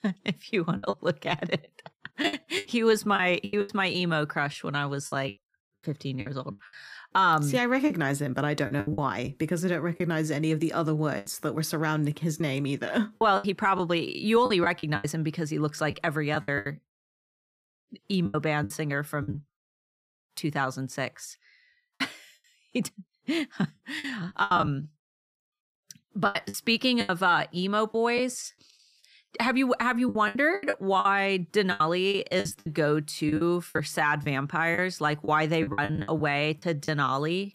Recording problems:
choppy; very; 11% of the speech affected

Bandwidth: 15 kHz